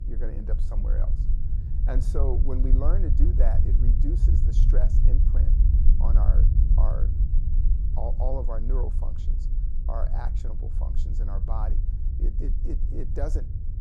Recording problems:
low rumble; loud; throughout; 5 dB below the speech
electrical hum; faint; throughout; 60 Hz, 25 dB below the speech

